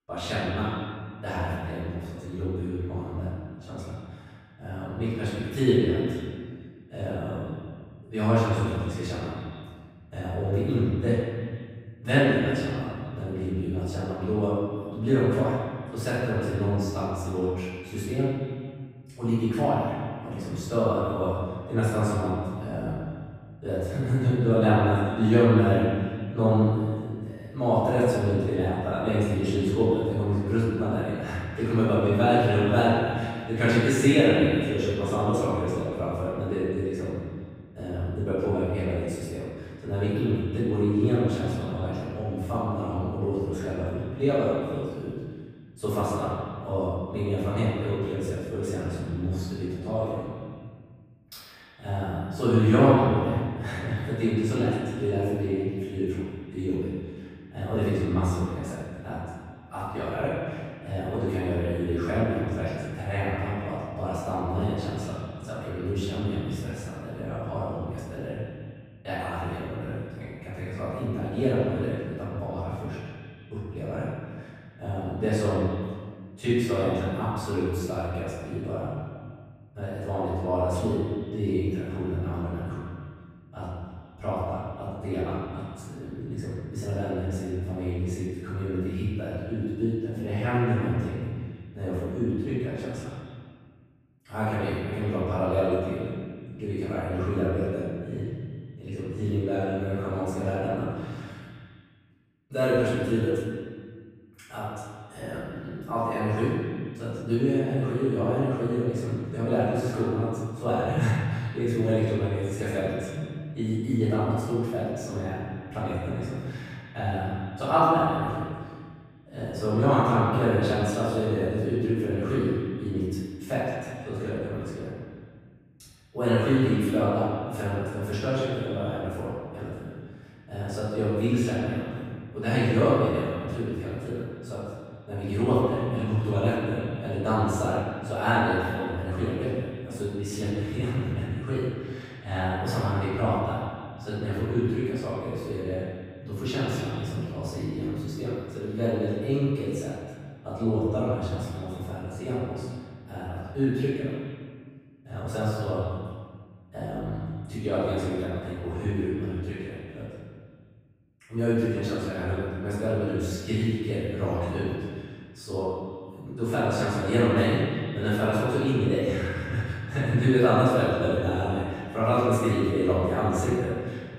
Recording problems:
room echo; strong; dies away in 1.7 s
off-mic speech; far
echo of what is said; noticeable; throughout; 150 ms later, 15 dB below the speech

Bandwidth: 15.5 kHz